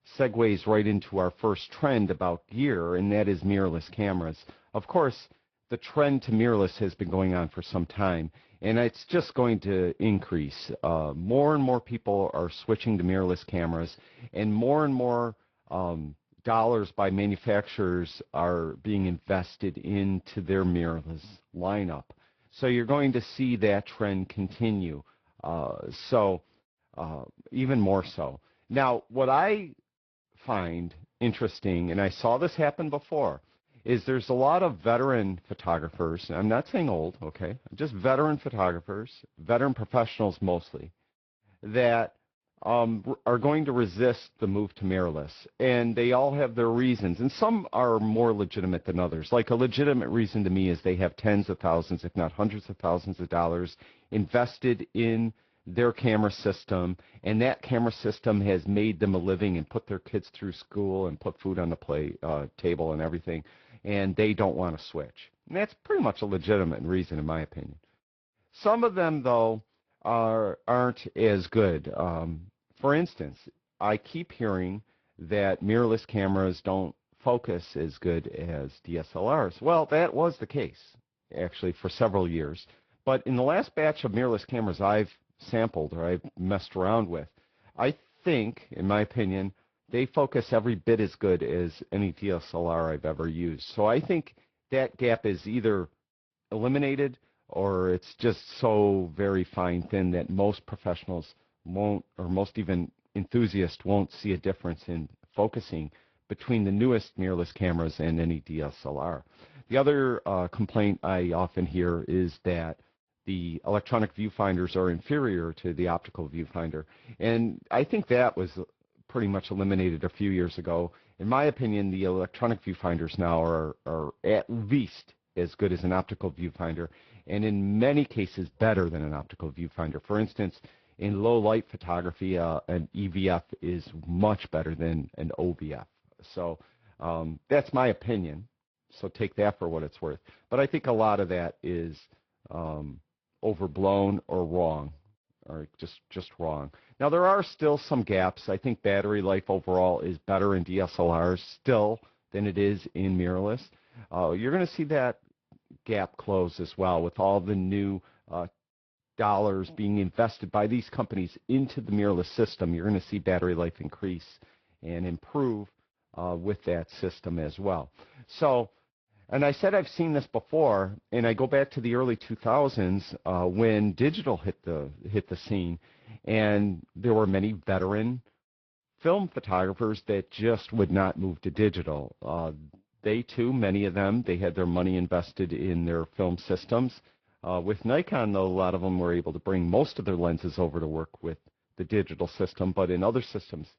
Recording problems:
high frequencies cut off; noticeable; nothing above 5.5 kHz
garbled, watery; slightly

